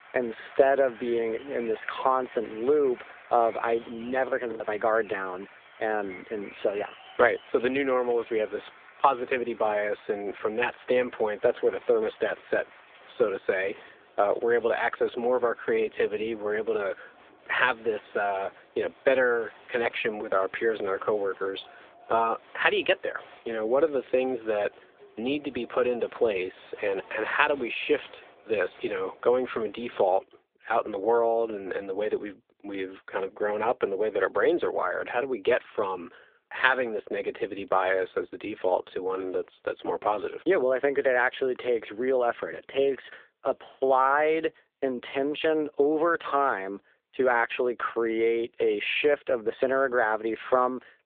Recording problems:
phone-call audio
crowd noise; faint; until 30 s; 25 dB below the speech
choppy; occasionally; at 4.5 s; 3% of the speech affected

